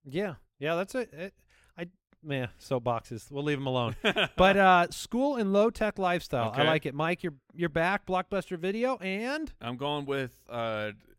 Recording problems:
none

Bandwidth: 16 kHz